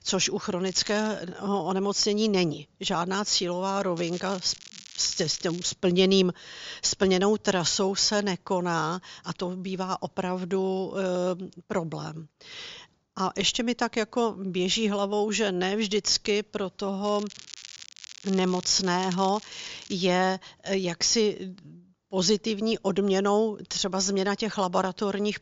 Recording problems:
high frequencies cut off; noticeable; nothing above 7.5 kHz
crackling; noticeable; at 0.5 s, from 4 to 5.5 s and from 17 to 20 s; 15 dB below the speech

